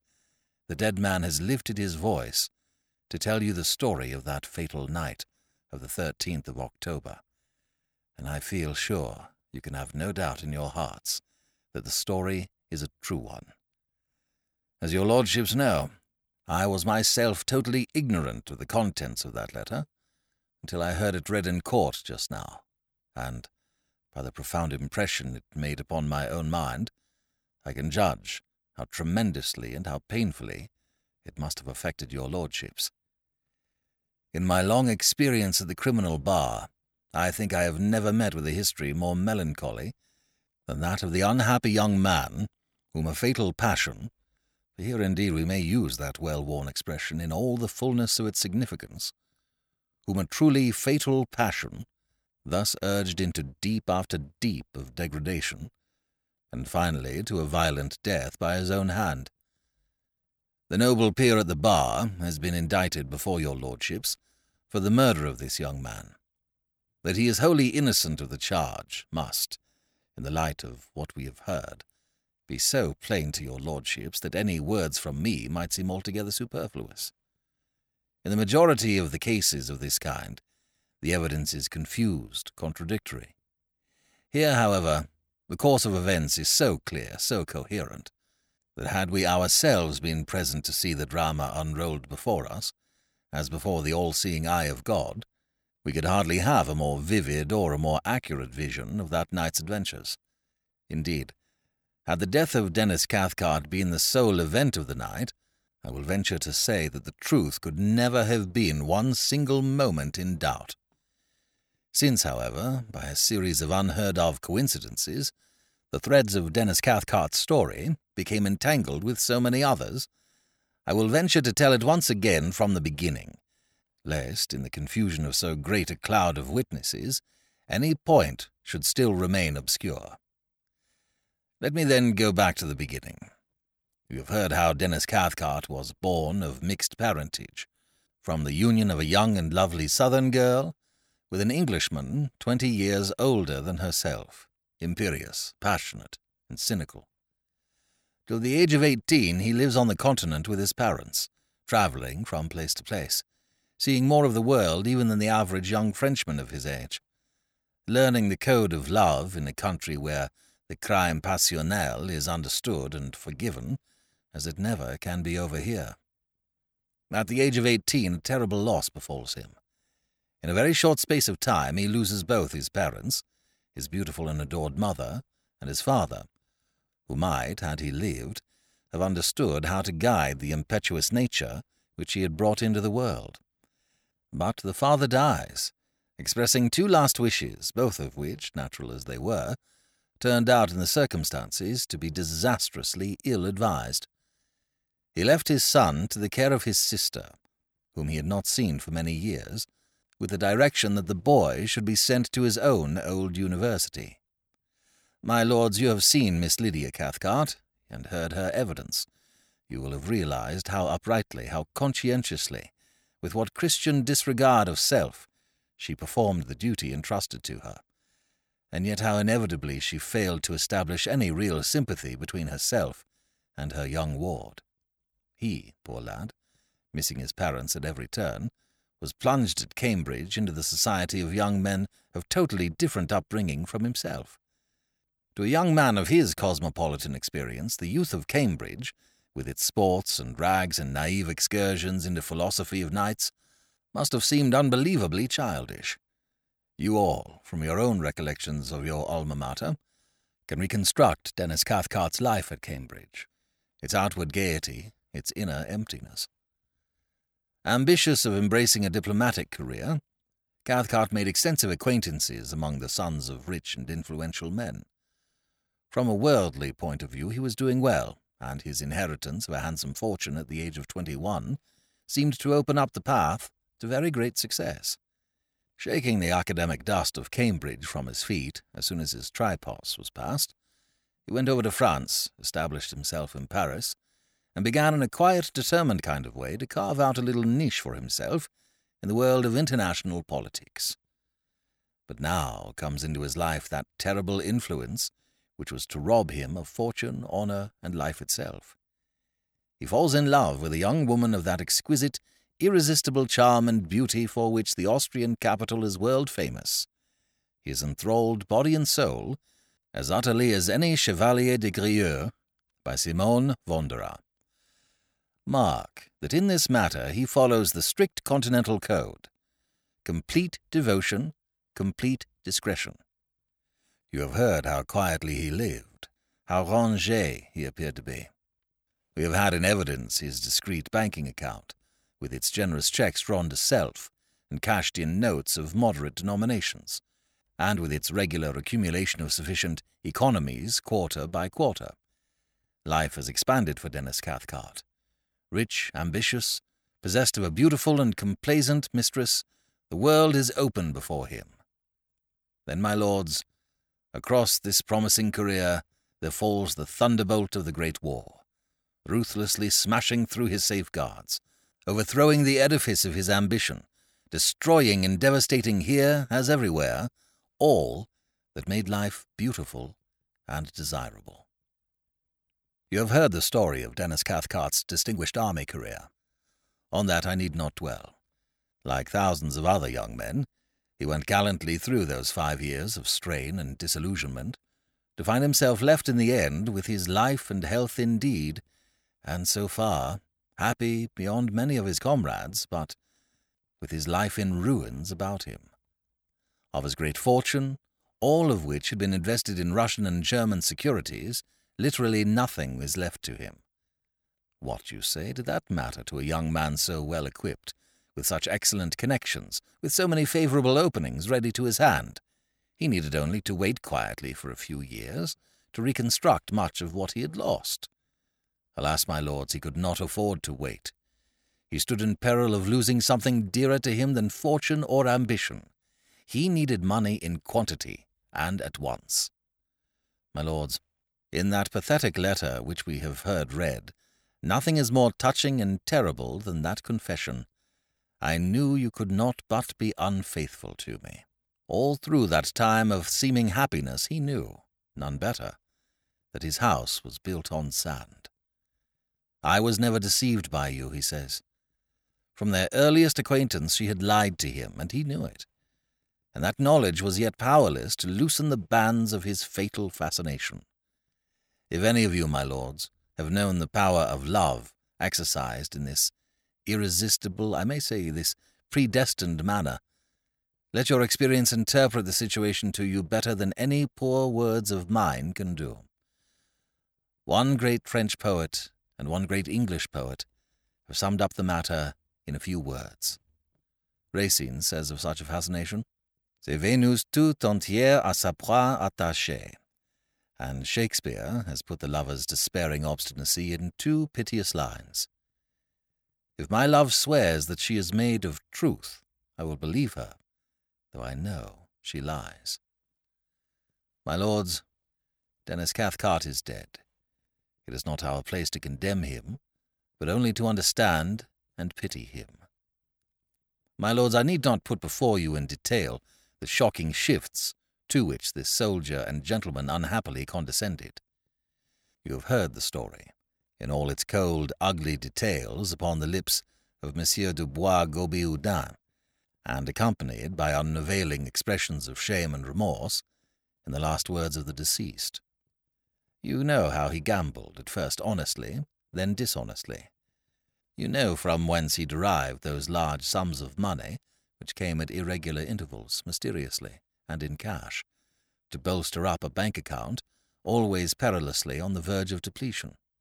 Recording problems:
none

